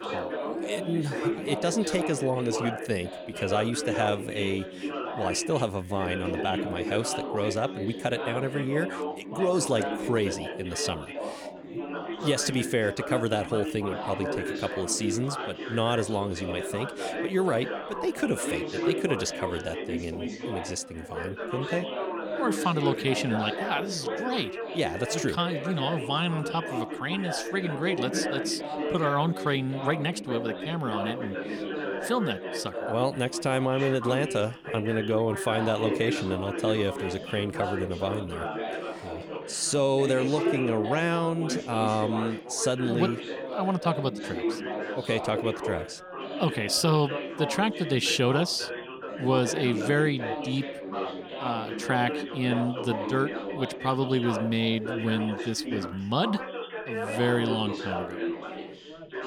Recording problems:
chatter from many people; loud; throughout; 5 dB below the speech

